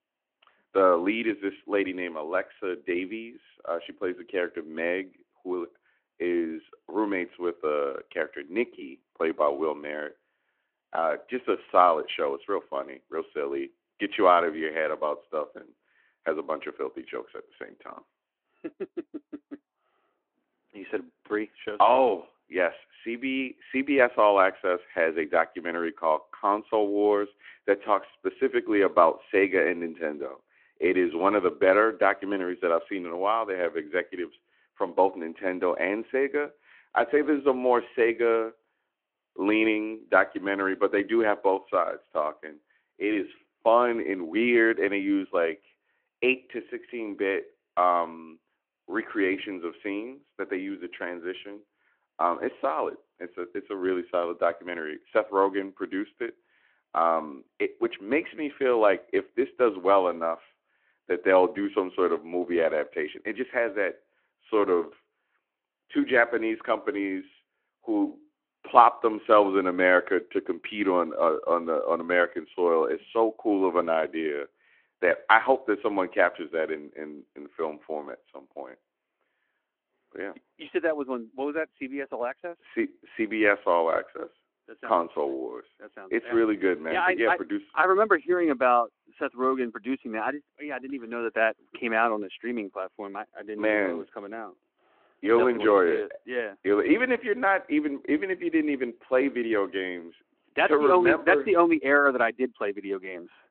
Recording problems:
phone-call audio

